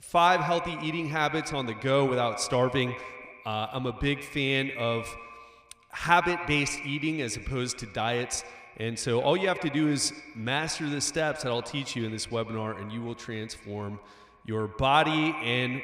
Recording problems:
echo of what is said; strong; throughout; 110 ms later, 10 dB below the speech

